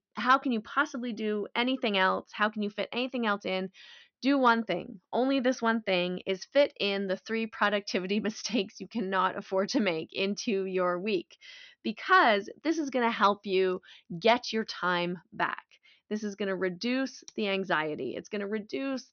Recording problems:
high frequencies cut off; noticeable; nothing above 6 kHz

